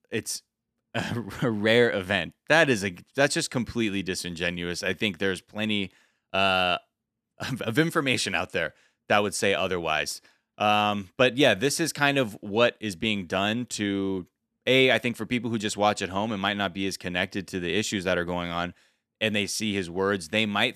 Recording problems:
none

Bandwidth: 14 kHz